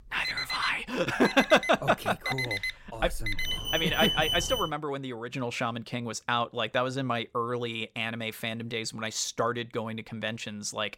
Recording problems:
alarms or sirens; loud; until 4.5 s; 2 dB below the speech

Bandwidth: 16.5 kHz